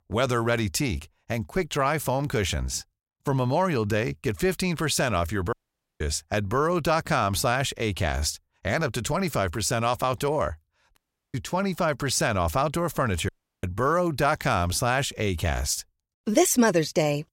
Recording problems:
audio cutting out; at 5.5 s, at 11 s and at 13 s

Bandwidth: 16 kHz